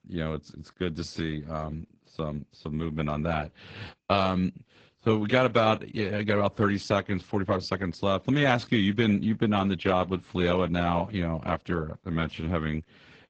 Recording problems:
high frequencies cut off; noticeable; nothing above 7.5 kHz
garbled, watery; slightly

